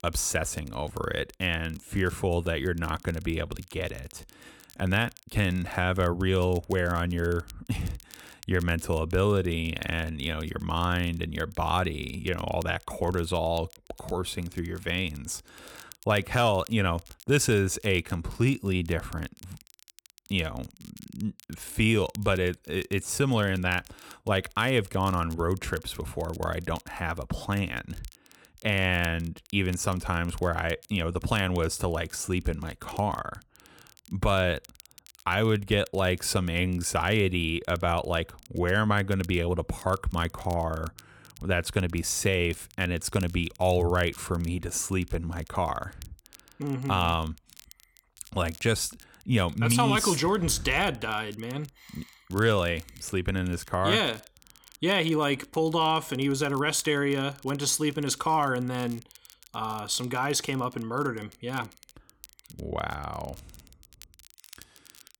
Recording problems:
crackle, like an old record; faint; 25 dB below the speech

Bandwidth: 18 kHz